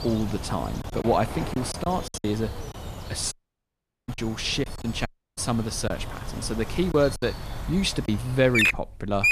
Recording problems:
animal sounds; loud; throughout; 4 dB below the speech
choppy; very; from 1 to 2 s, from 4 to 6 s and from 7 to 8 s; 9% of the speech affected
audio cutting out; at 3.5 s for 1 s and at 5 s

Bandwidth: 14.5 kHz